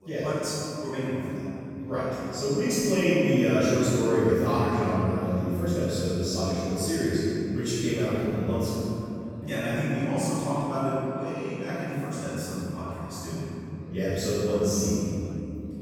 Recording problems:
room echo; strong; dies away in 3 s
off-mic speech; far
background chatter; faint; throughout; 3 voices, 25 dB below the speech

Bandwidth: 17.5 kHz